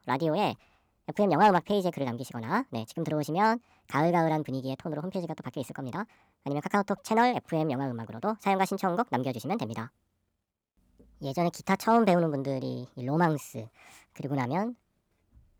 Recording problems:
wrong speed and pitch; too fast and too high; 1.5 times normal speed

